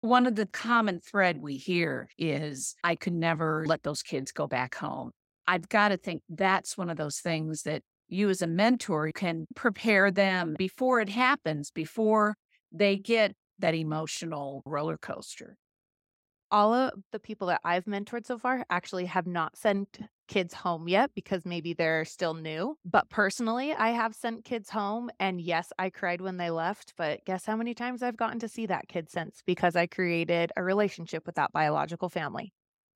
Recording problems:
none

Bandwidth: 16 kHz